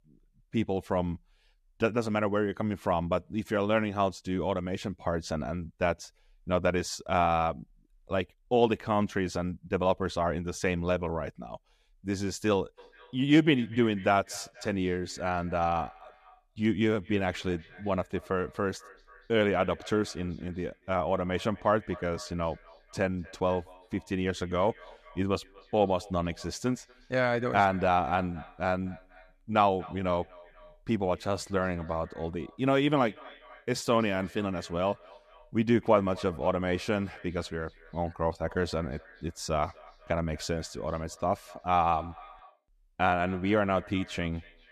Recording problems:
echo of what is said; faint; from 13 s on; 240 ms later, 20 dB below the speech

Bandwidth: 14.5 kHz